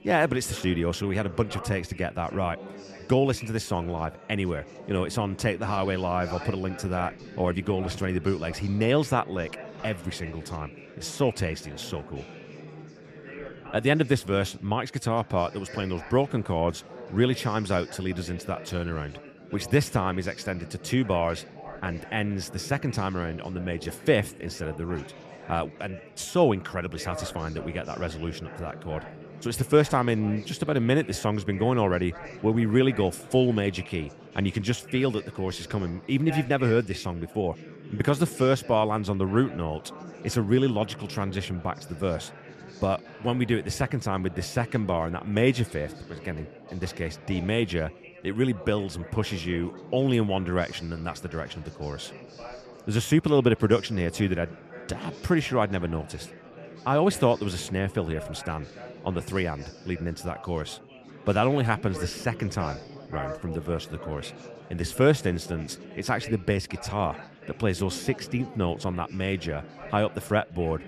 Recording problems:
chatter from many people; noticeable; throughout; 15 dB below the speech

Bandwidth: 14.5 kHz